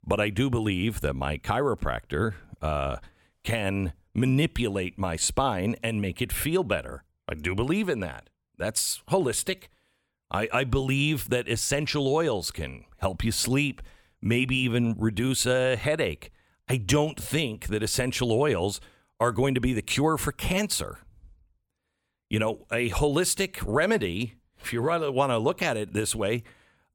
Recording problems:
none

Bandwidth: 18.5 kHz